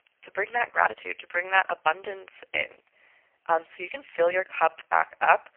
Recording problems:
phone-call audio; poor line; nothing above 3 kHz
thin; very; fading below 600 Hz
uneven, jittery; strongly; from 0.5 to 5 s

